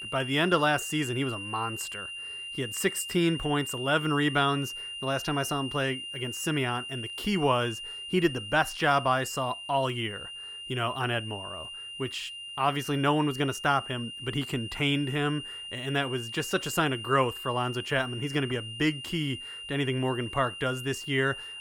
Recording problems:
high-pitched whine; loud; throughout; 3 kHz, 8 dB below the speech

